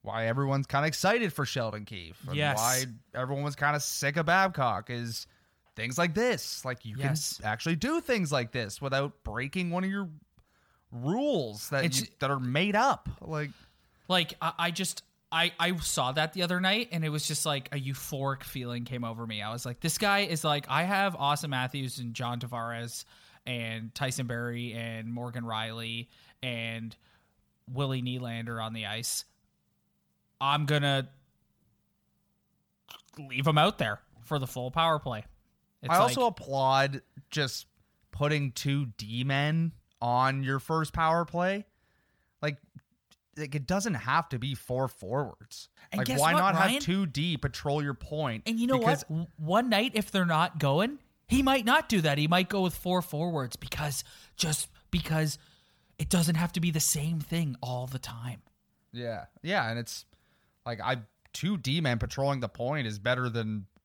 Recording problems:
none

